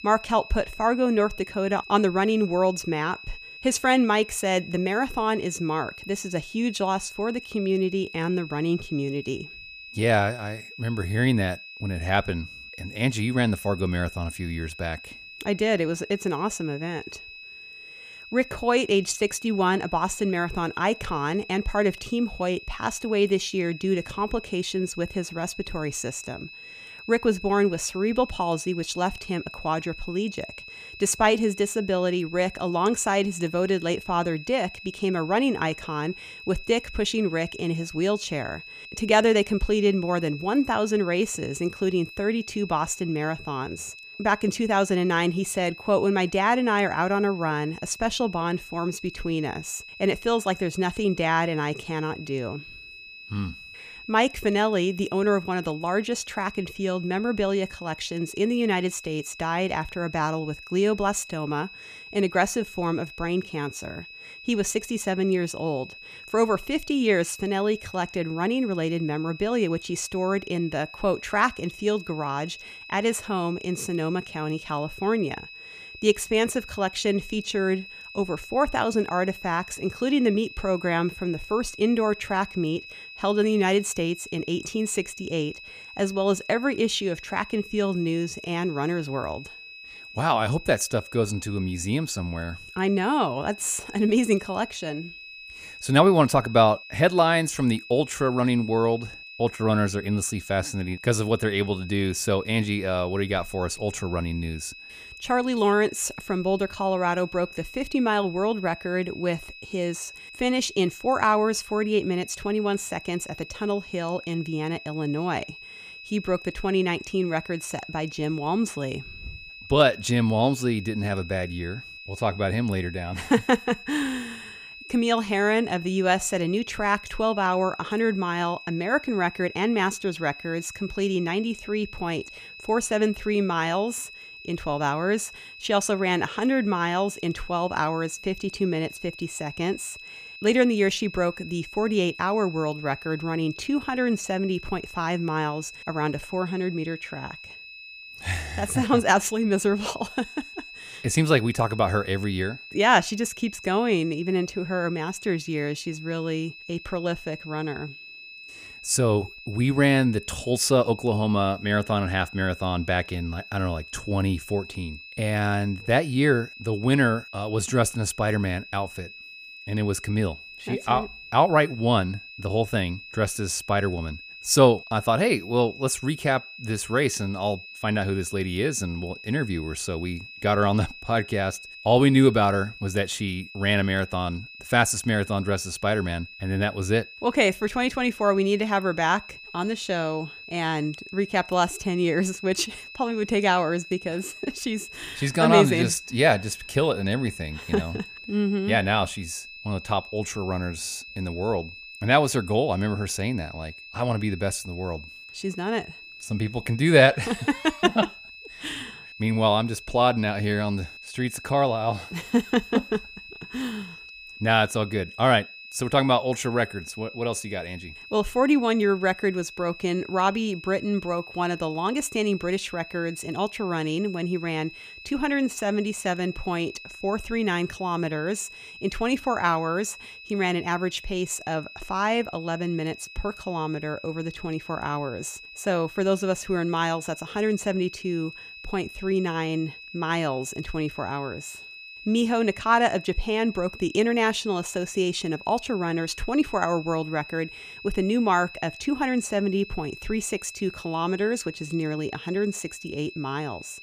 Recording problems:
high-pitched whine; noticeable; throughout; 2.5 kHz, 15 dB below the speech

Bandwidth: 15 kHz